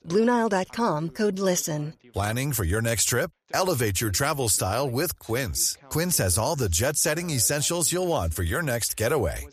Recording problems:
voice in the background; faint; throughout; 30 dB below the speech

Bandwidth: 14.5 kHz